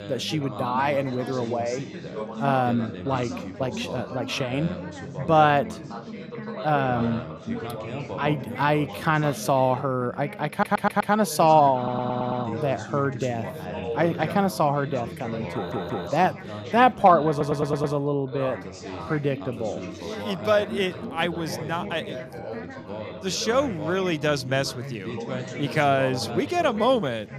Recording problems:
background chatter; loud; throughout; 4 voices, 10 dB below the speech
audio stuttering; 4 times, first at 11 s

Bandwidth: 14.5 kHz